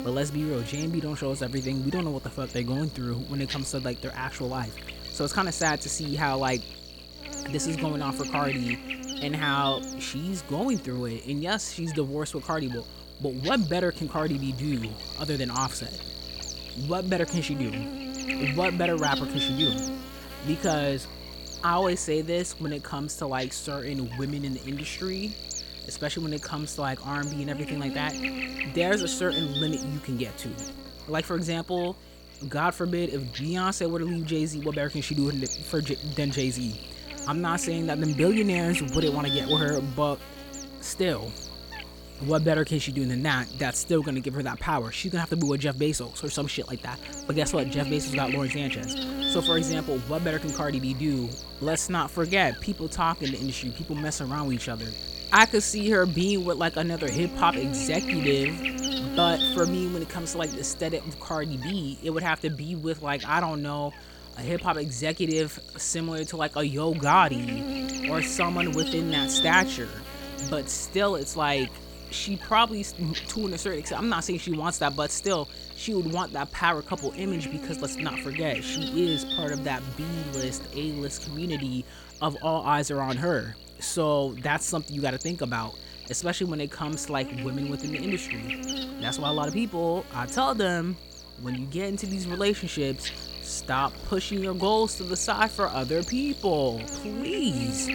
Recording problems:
electrical hum; loud; throughout; 60 Hz, 6 dB below the speech

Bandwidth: 17.5 kHz